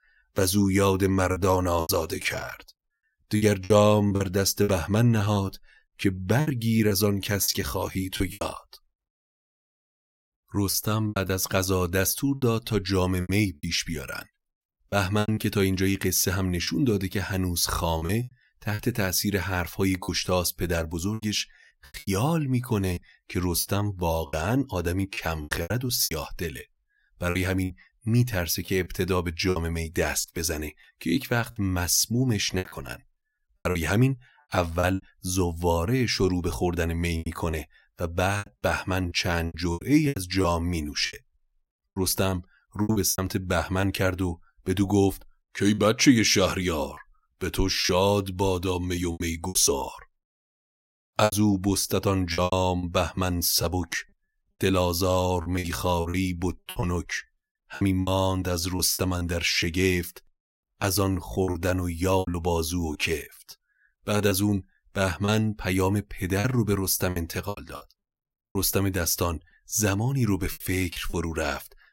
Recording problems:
choppy; very; 10% of the speech affected

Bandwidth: 16 kHz